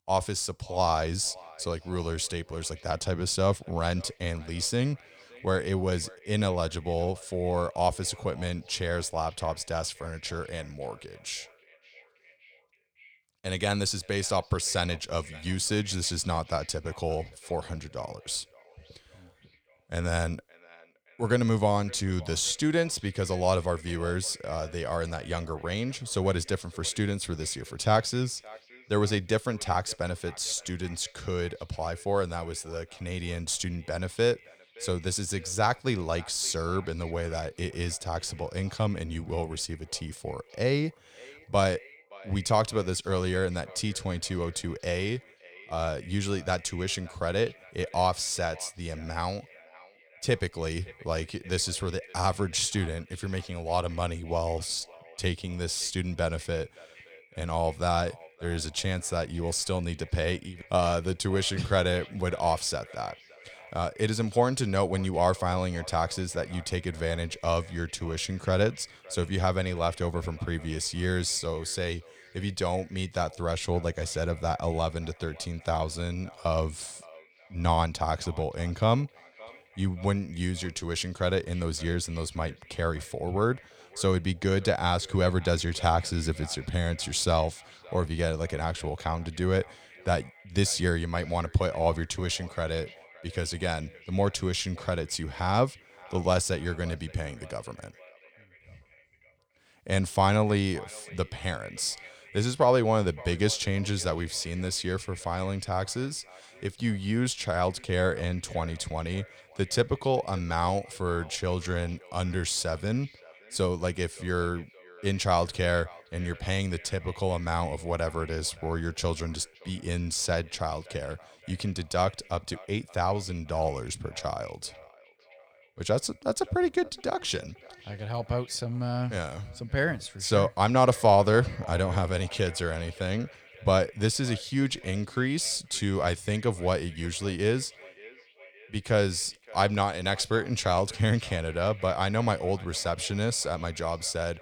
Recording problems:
echo of what is said; faint; throughout; 570 ms later, 20 dB below the speech

